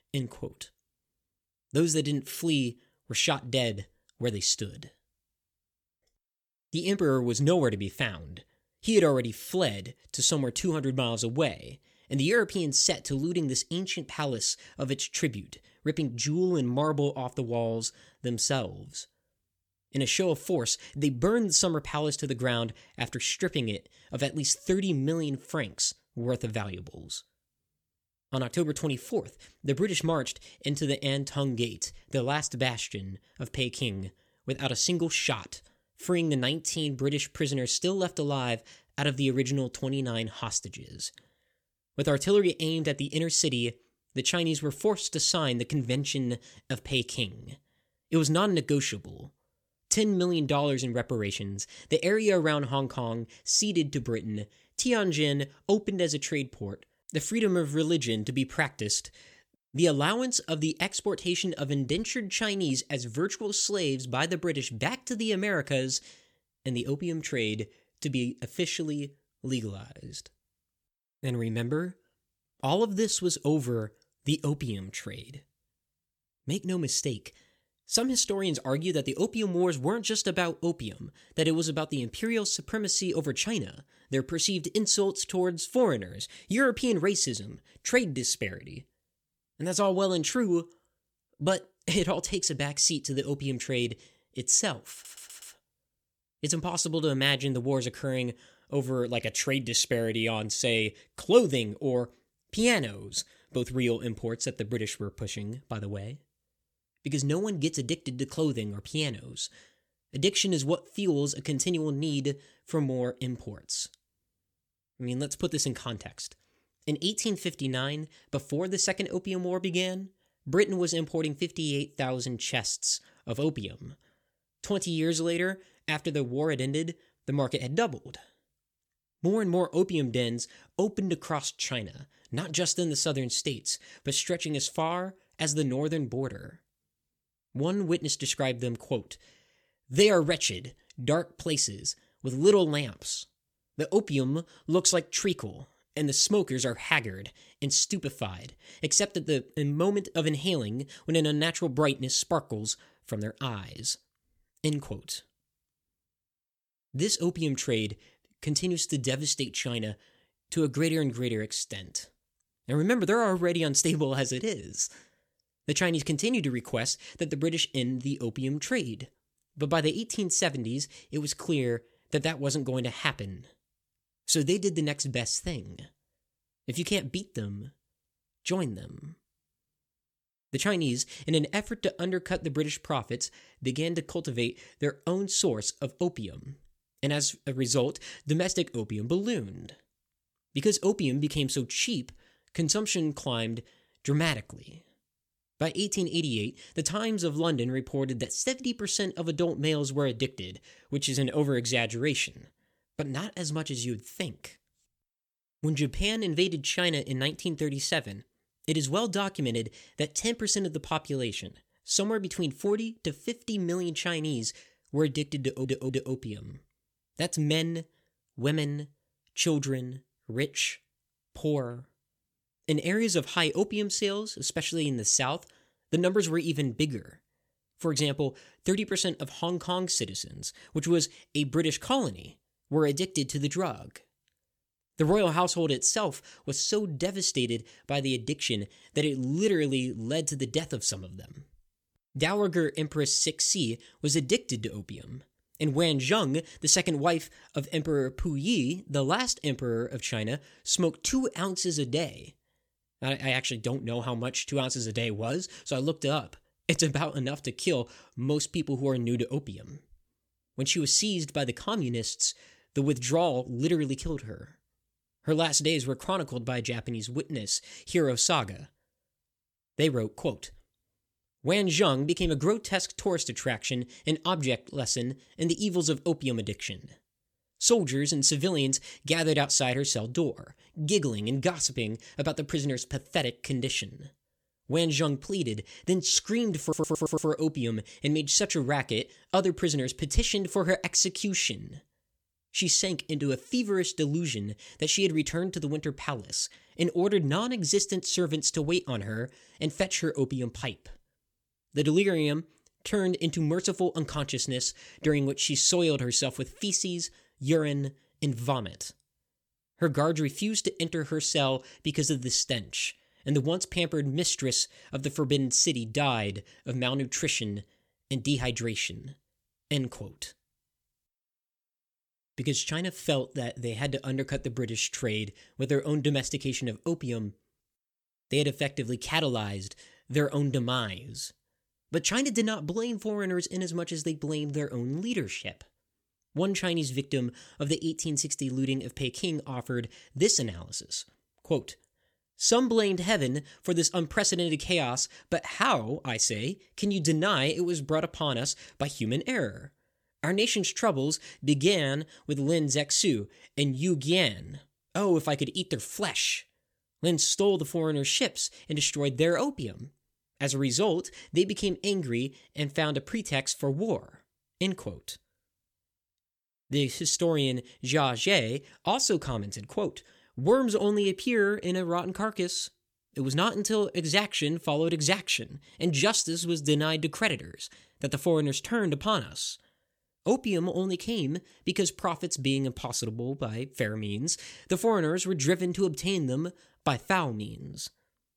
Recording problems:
audio stuttering; at 1:35, at 3:35 and at 4:47

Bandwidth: 18.5 kHz